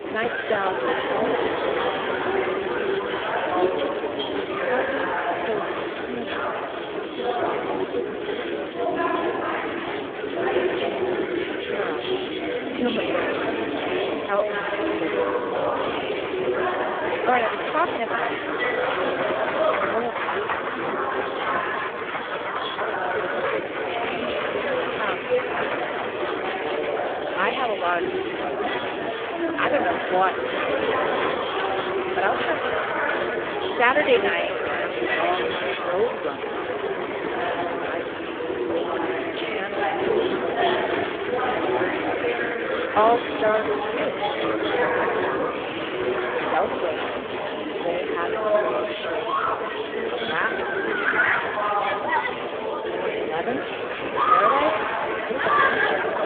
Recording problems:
phone-call audio; poor line
echo of what is said; strong; throughout; 410 ms later, 7 dB below the speech
murmuring crowd; very loud; throughout; 3 dB above the speech

